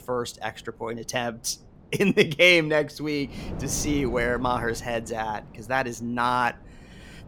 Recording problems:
wind noise on the microphone; occasional gusts; 20 dB below the speech

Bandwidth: 17 kHz